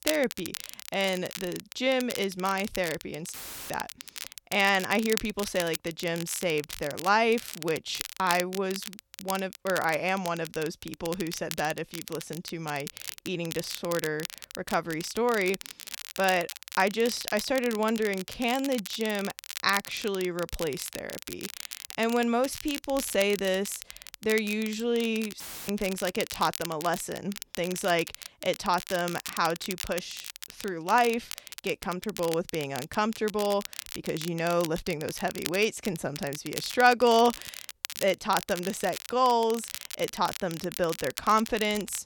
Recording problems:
crackle, like an old record; noticeable; 10 dB below the speech
audio cutting out; filled with static; at 3.5 s and at 25 s

